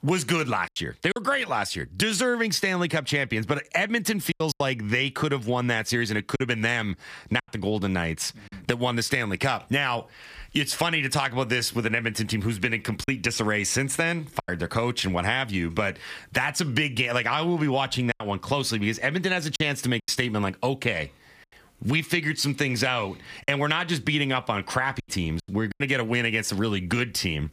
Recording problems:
squashed, flat; somewhat
choppy; occasionally; 4% of the speech affected

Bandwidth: 15 kHz